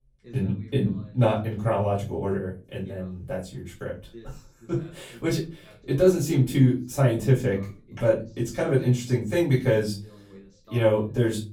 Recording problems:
off-mic speech; far
room echo; slight; dies away in 0.3 s
voice in the background; faint; throughout; 25 dB below the speech

